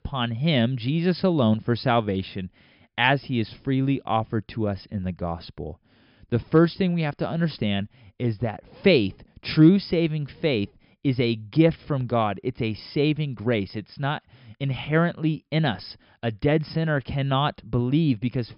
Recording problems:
high frequencies cut off; noticeable; nothing above 5.5 kHz

